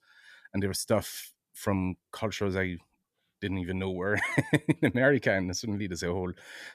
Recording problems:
none

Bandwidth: 14.5 kHz